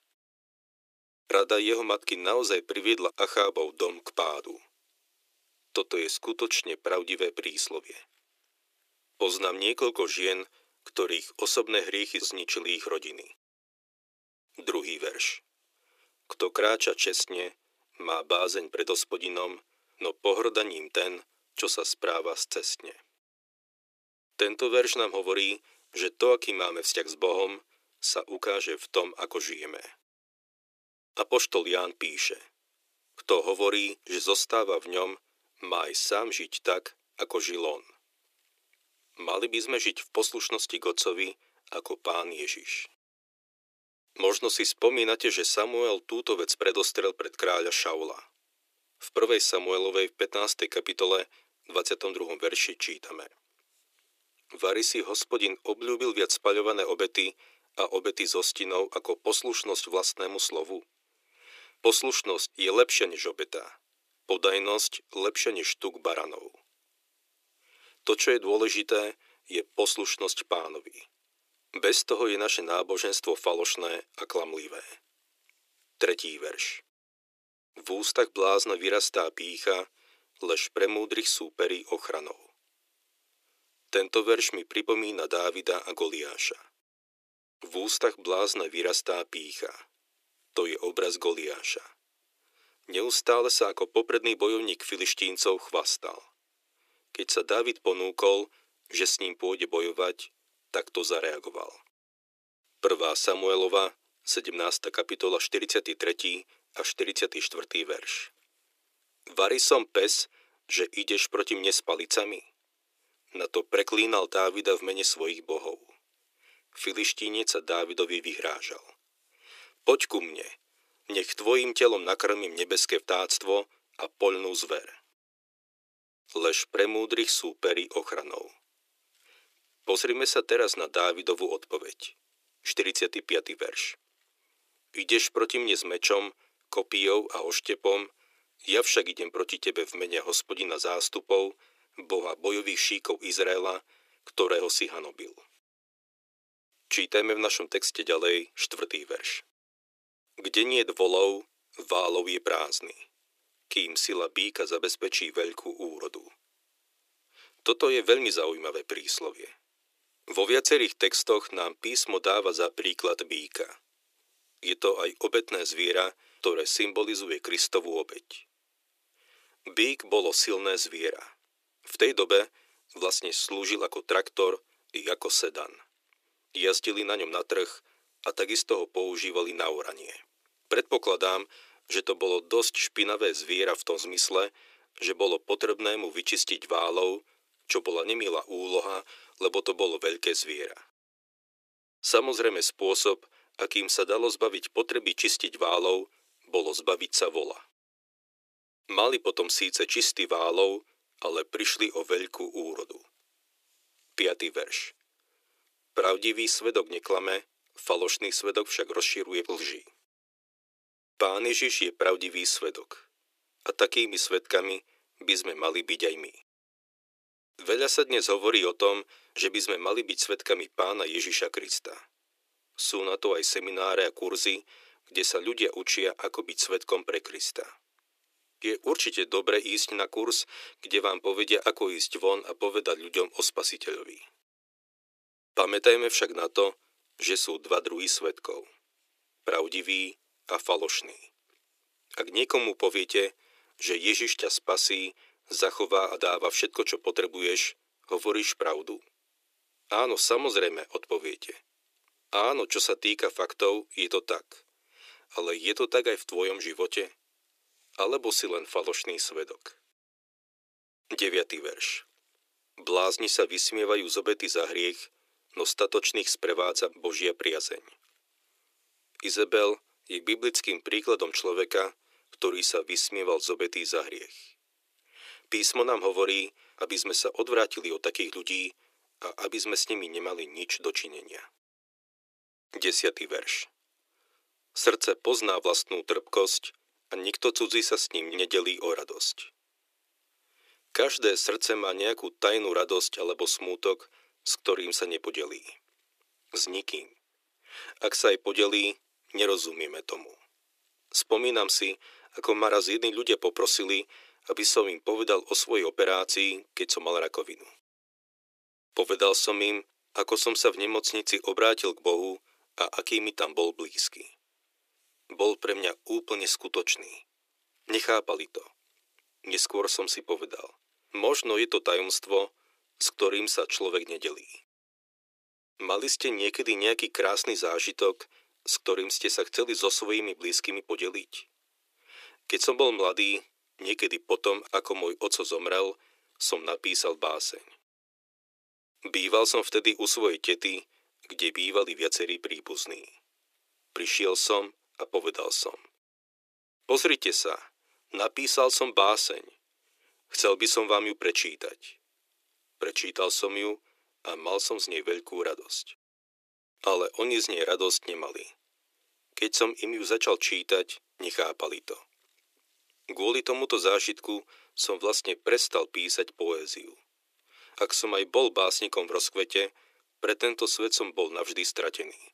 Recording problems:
thin; very; fading below 350 Hz

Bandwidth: 14.5 kHz